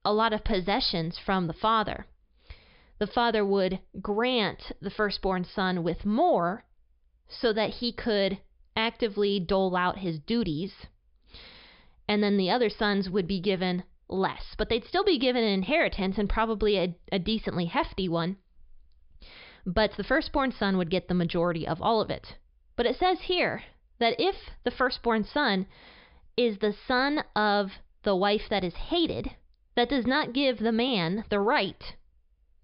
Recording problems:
high frequencies cut off; noticeable; nothing above 5.5 kHz

